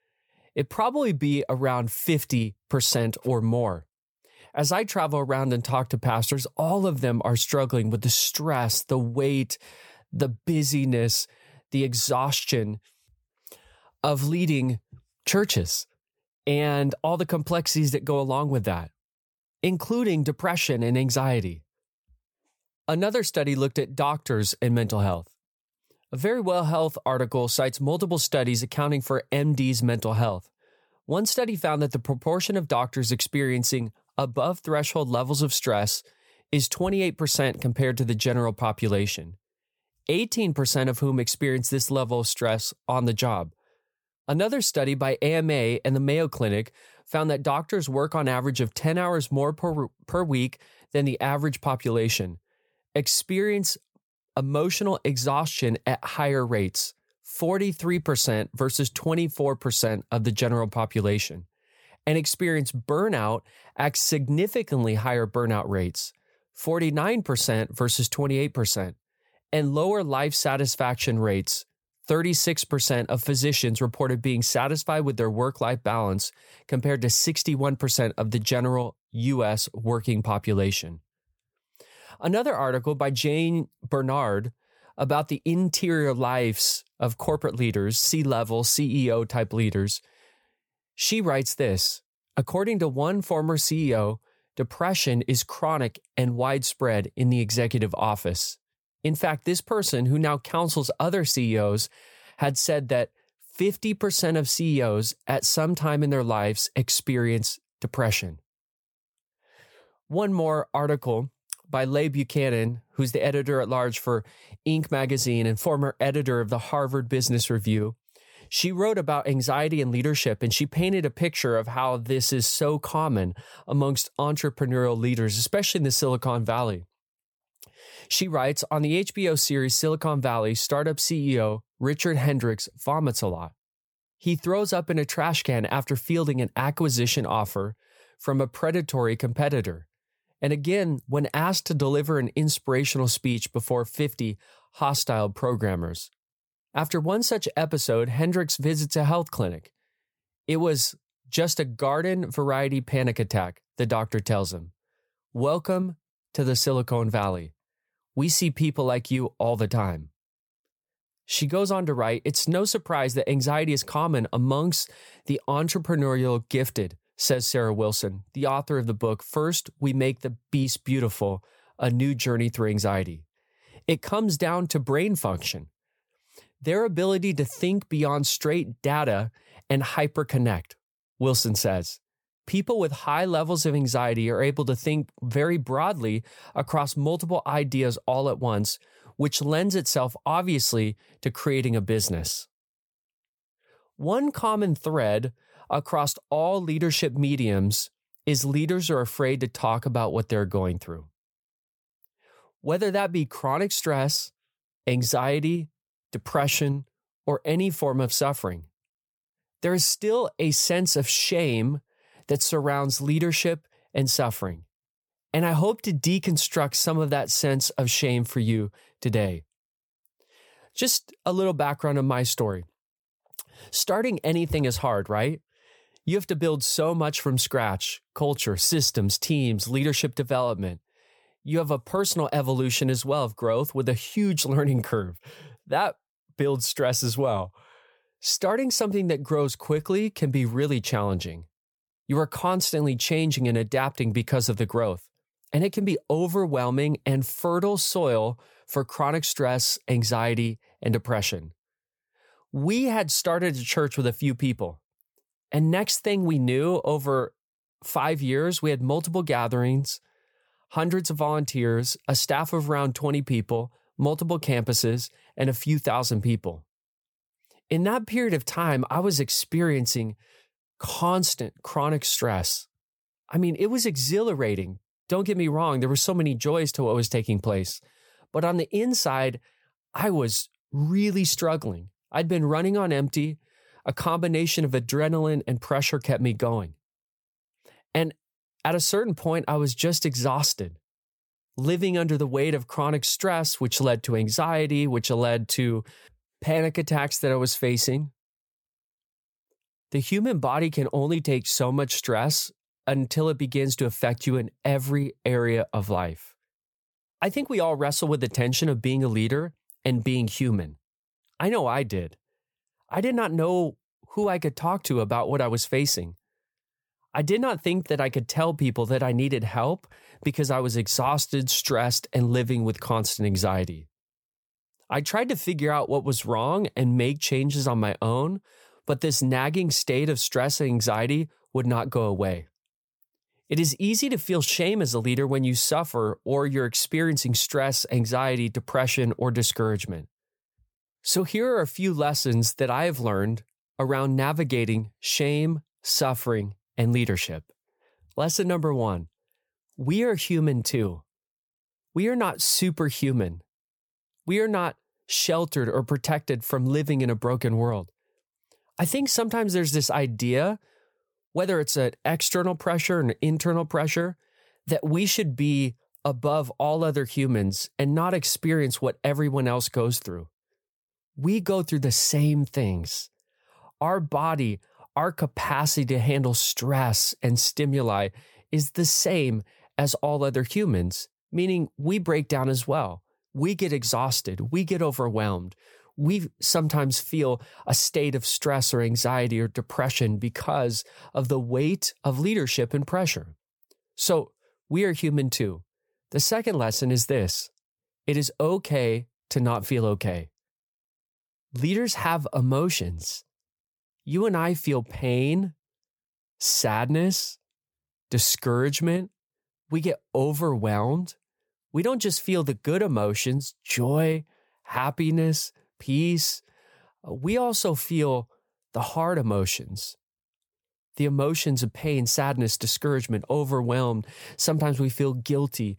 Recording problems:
none

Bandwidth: 18.5 kHz